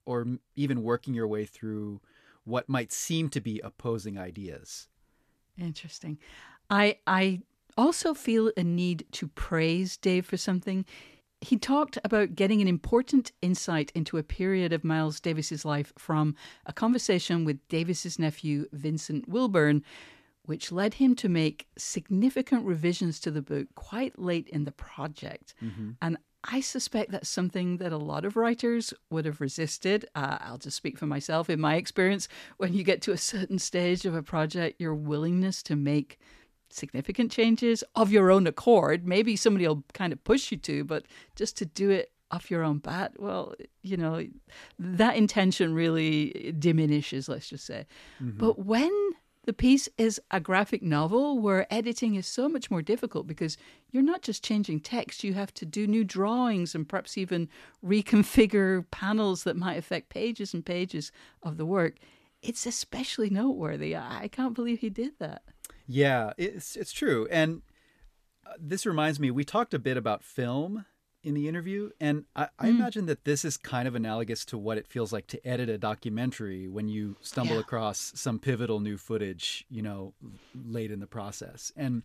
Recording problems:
none

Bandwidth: 14.5 kHz